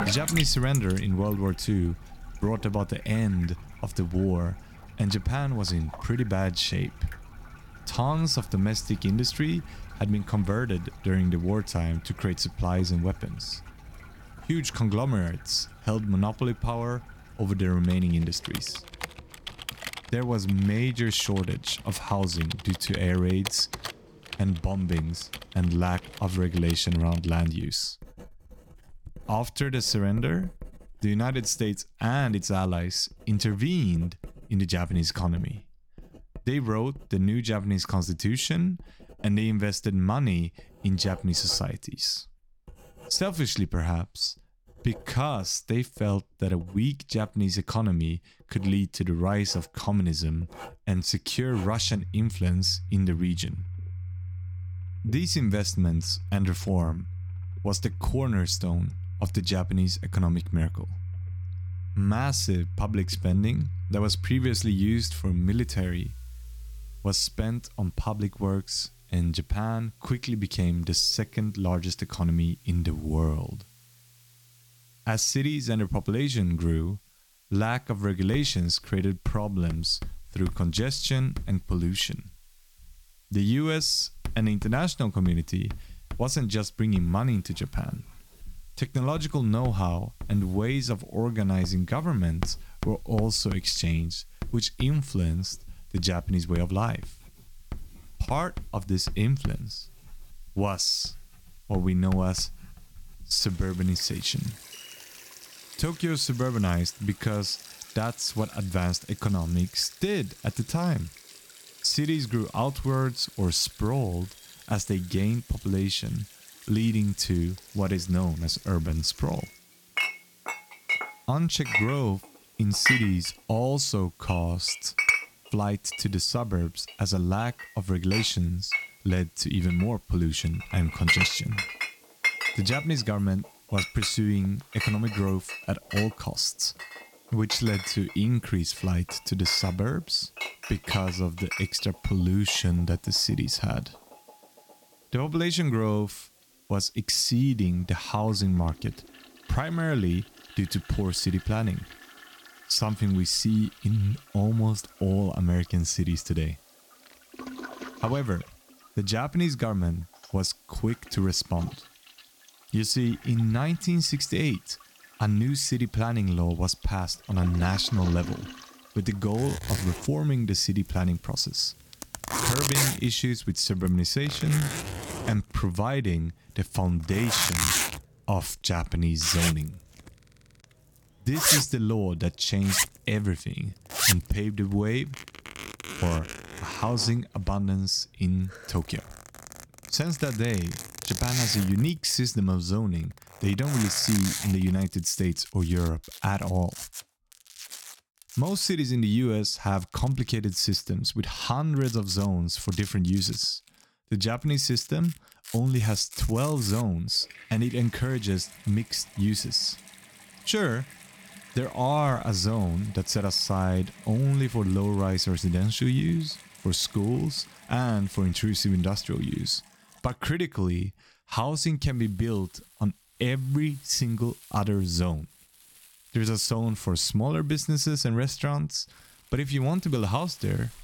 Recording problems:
household noises; loud; throughout; 7 dB below the speech
hiss; faint; from 1:05 to 2:53; 30 dB below the speech

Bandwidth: 17.5 kHz